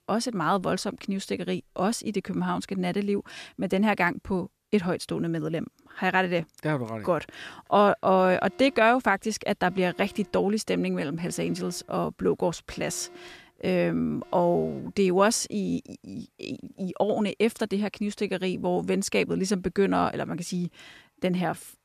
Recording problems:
alarms or sirens; faint; throughout; 25 dB below the speech

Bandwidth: 14.5 kHz